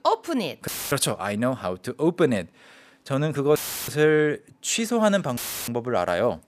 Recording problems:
audio cutting out; filled with static; at 0.5 s, at 3.5 s and at 5.5 s

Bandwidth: 14.5 kHz